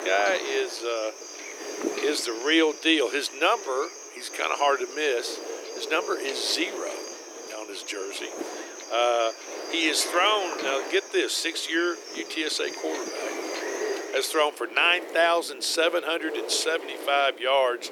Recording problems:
thin; very; fading below 300 Hz
animal sounds; noticeable; throughout; 15 dB below the speech
wind noise on the microphone; occasional gusts; 10 dB below the speech

